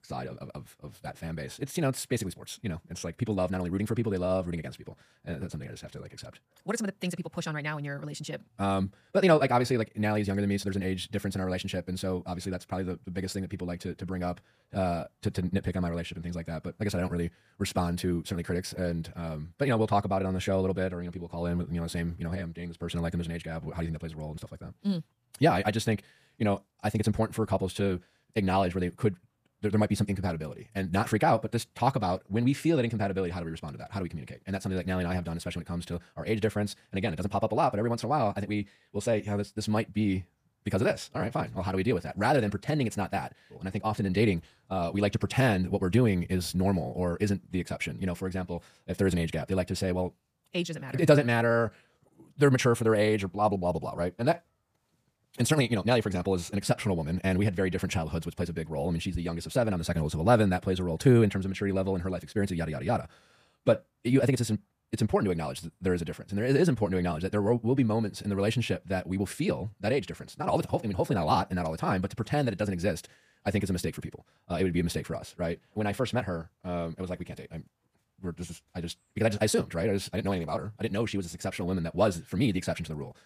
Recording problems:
wrong speed, natural pitch; too fast; 1.7 times normal speed

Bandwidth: 15 kHz